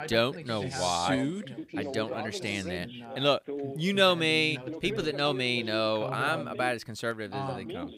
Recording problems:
background chatter; loud; throughout; 2 voices, 10 dB below the speech

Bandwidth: 15.5 kHz